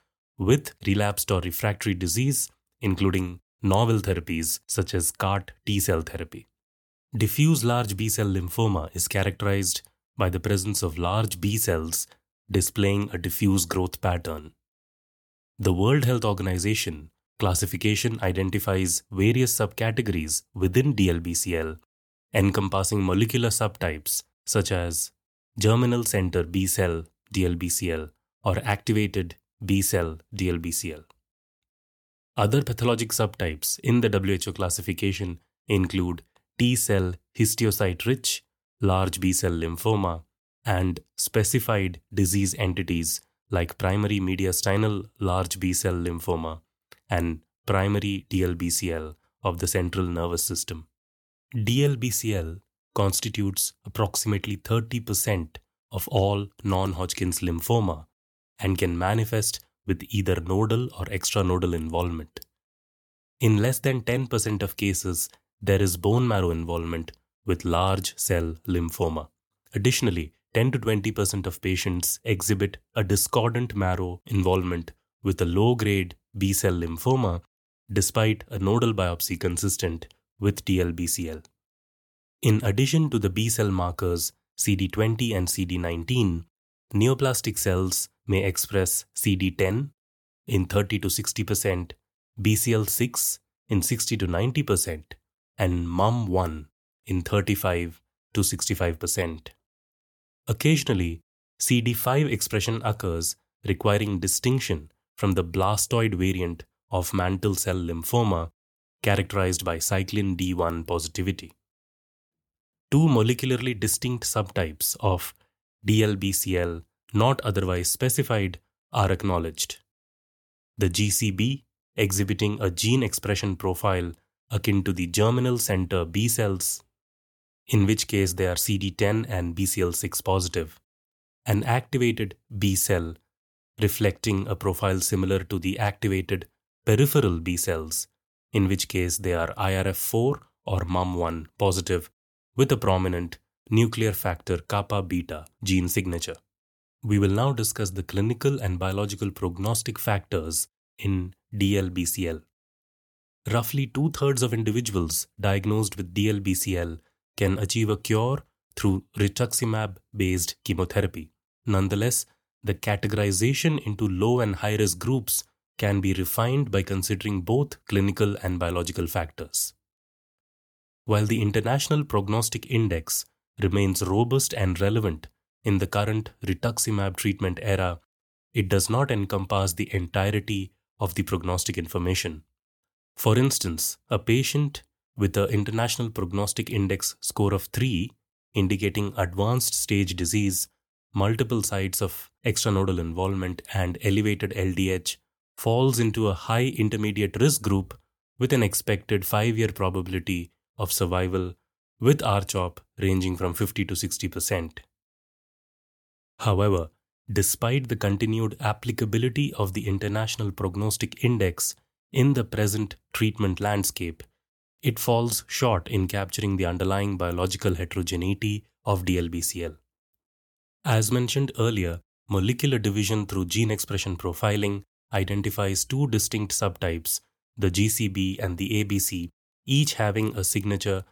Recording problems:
none

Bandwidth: 18.5 kHz